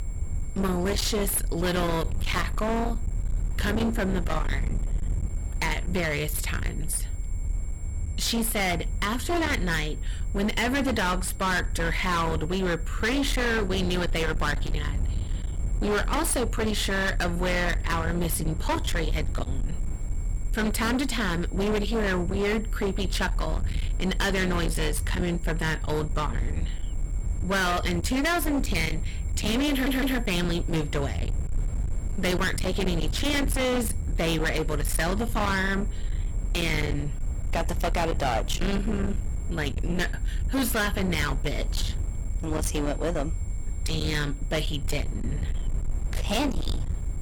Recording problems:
distortion; heavy; 31% of the sound clipped
low rumble; noticeable; throughout; 10 dB below the speech
high-pitched whine; faint; throughout; 7.5 kHz, 25 dB below the speech
audio stuttering; at 30 s

